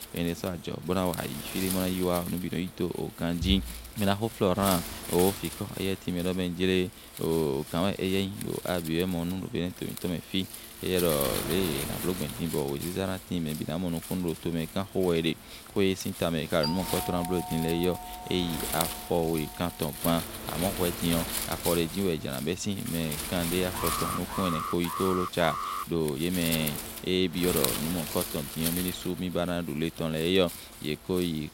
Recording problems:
wind noise on the microphone; heavy; 7 dB below the speech
doorbell; noticeable; from 17 to 20 s; peak 4 dB below the speech
alarm; noticeable; from 24 to 26 s; peak 3 dB below the speech

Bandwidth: 16 kHz